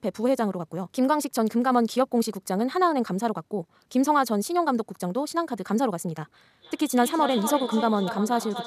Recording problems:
echo of what is said; strong; from 6.5 s on; 240 ms later, 9 dB below the speech
wrong speed, natural pitch; too fast; 1.6 times normal speed

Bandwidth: 14.5 kHz